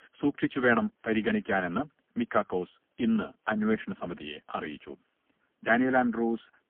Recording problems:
phone-call audio; poor line; nothing above 3.5 kHz

